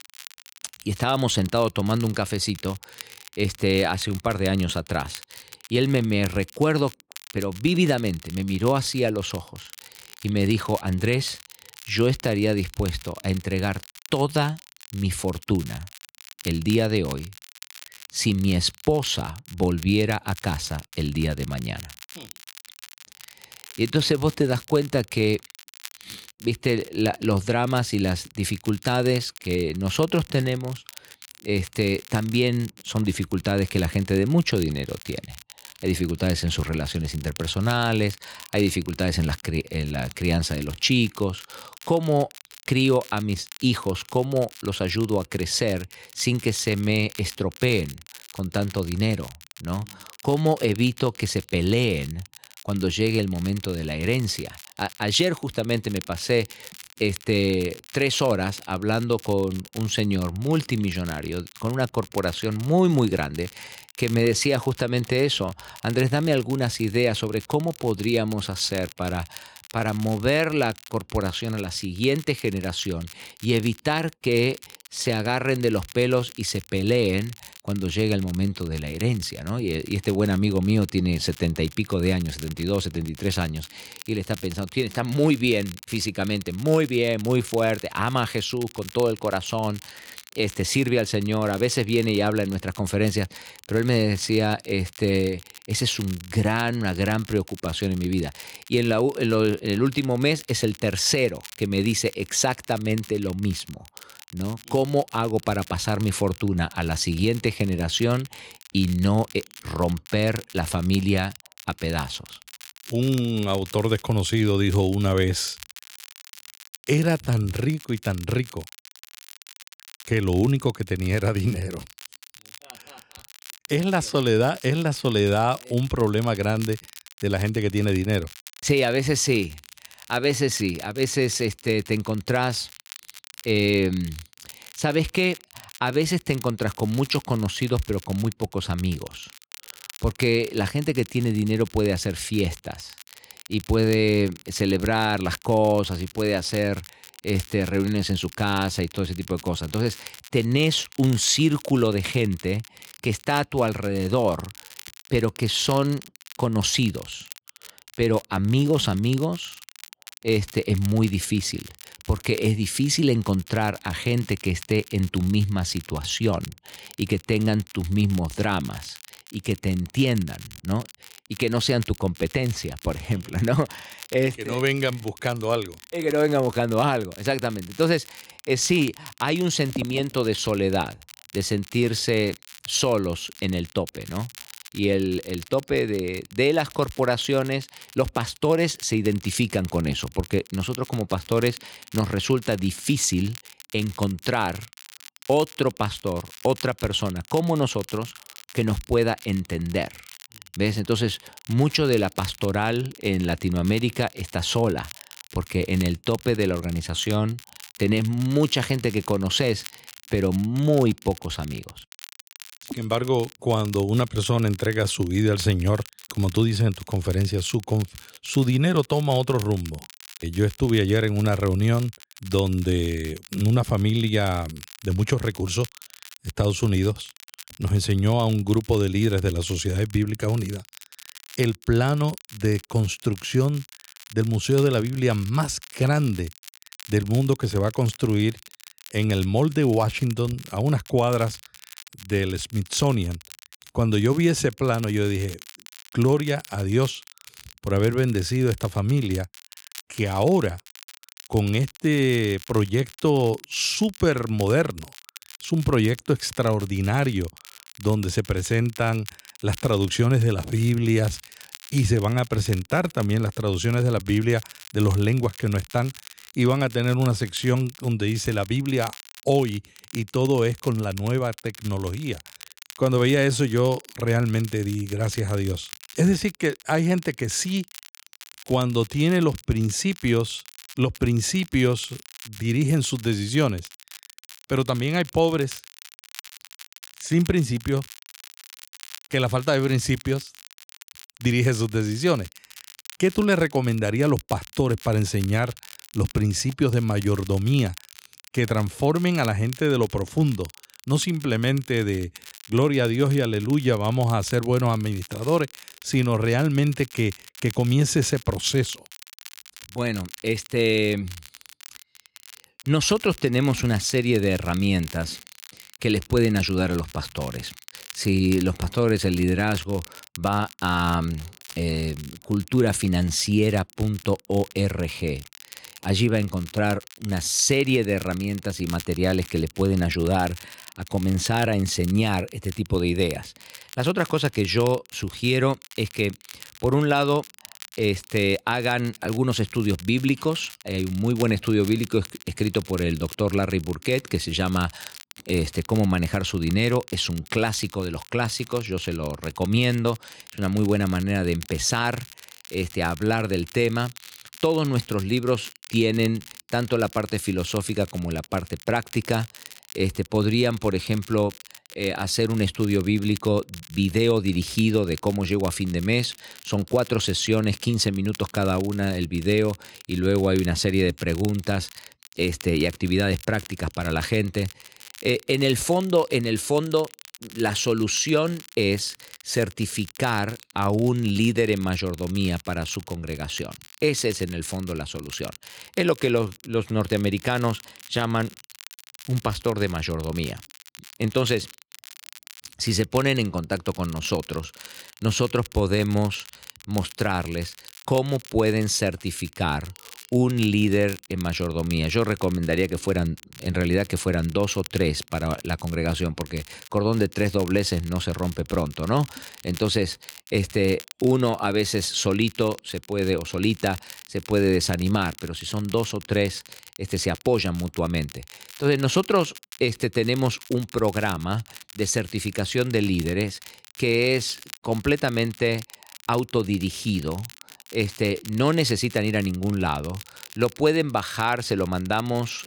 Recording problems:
crackle, like an old record; noticeable; 20 dB below the speech

